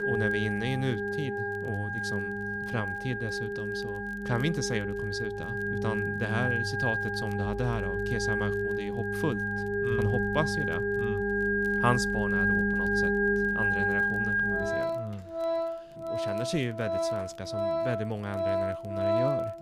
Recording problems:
background music; very loud; throughout; 5 dB above the speech
crackle, like an old record; faint; 30 dB below the speech

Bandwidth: 15 kHz